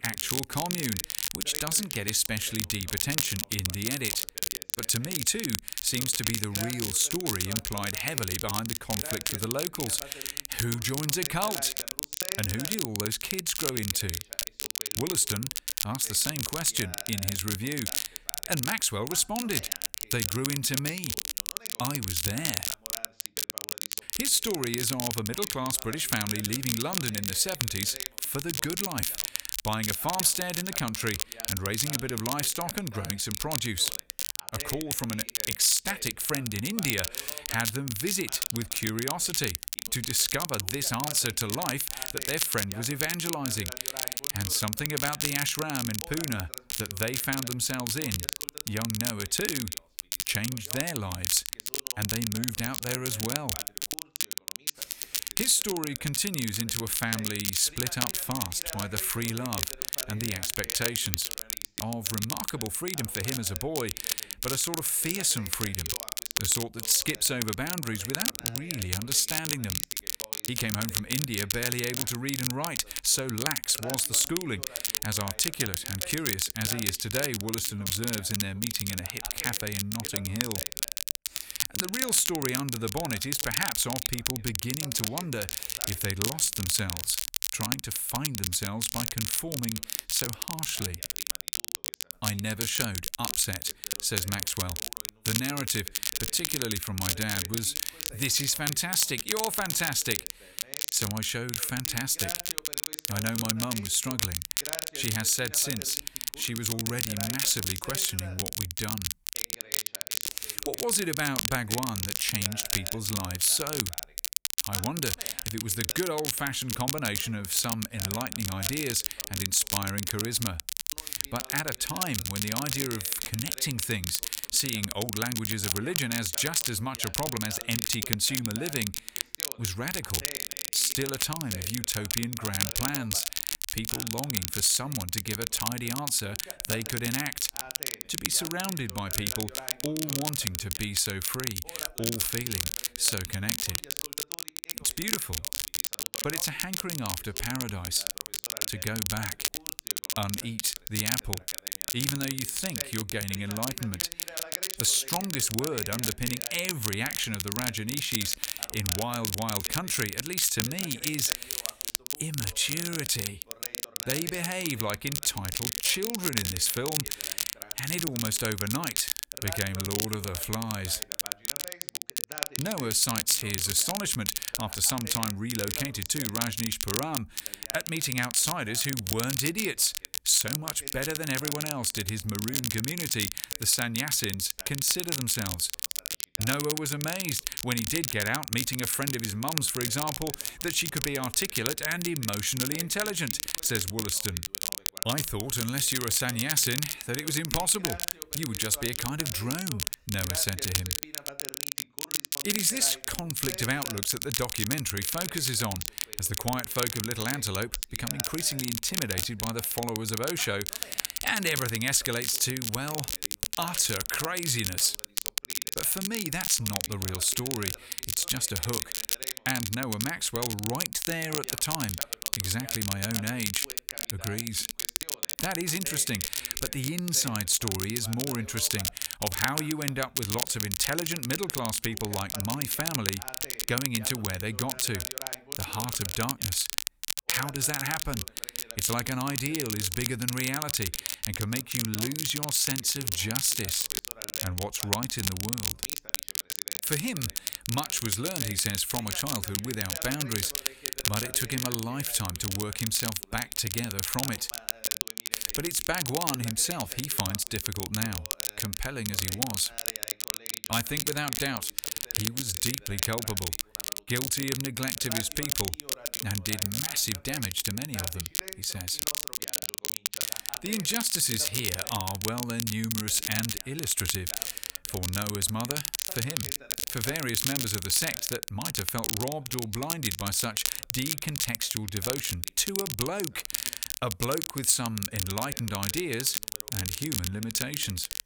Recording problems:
crackle, like an old record; loud; 1 dB below the speech
voice in the background; faint; throughout; 20 dB below the speech

